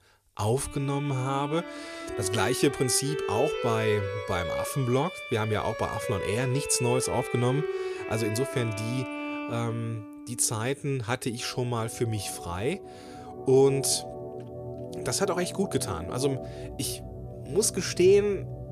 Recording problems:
background music; loud; throughout; 8 dB below the speech

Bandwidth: 14.5 kHz